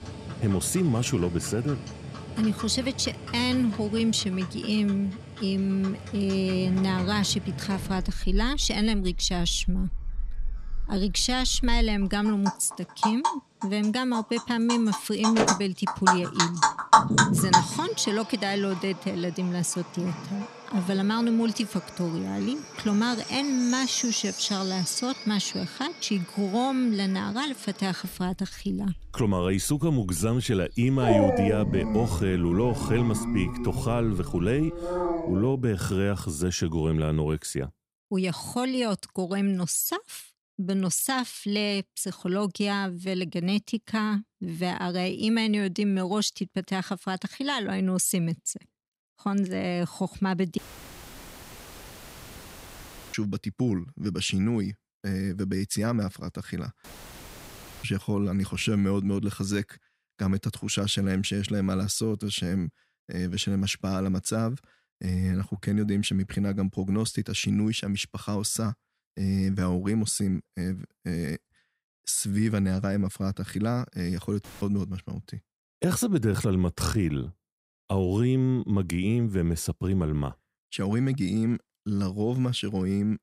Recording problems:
animal sounds; loud; until 35 s; 3 dB below the speech
audio cutting out; filled with static; at 51 s for 2.5 s, at 57 s for 1 s and at 1:14

